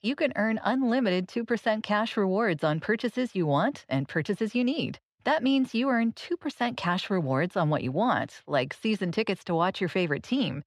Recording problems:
muffled; very slightly; fading above 3.5 kHz

